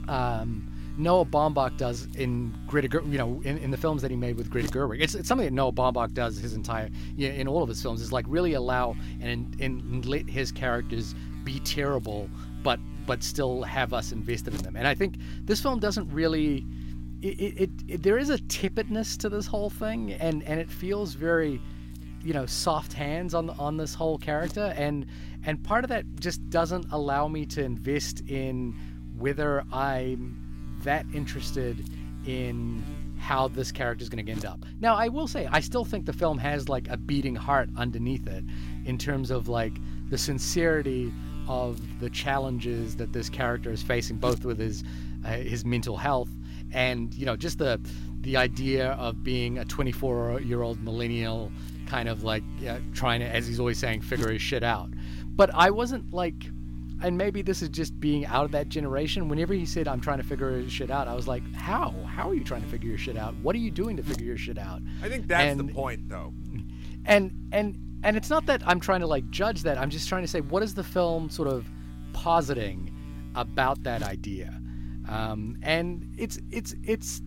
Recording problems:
electrical hum; noticeable; throughout; 60 Hz, 20 dB below the speech

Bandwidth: 16 kHz